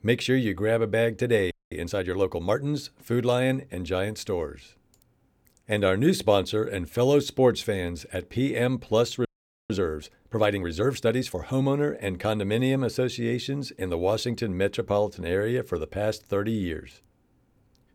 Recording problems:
audio freezing; at 1.5 s and at 9.5 s

